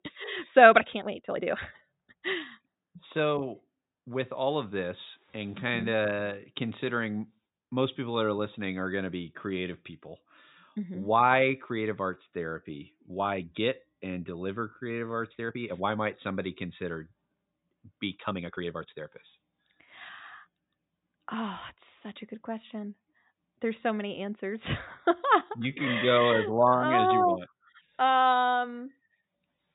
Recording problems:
high frequencies cut off; severe; nothing above 4 kHz
uneven, jittery; strongly; from 0.5 to 29 s

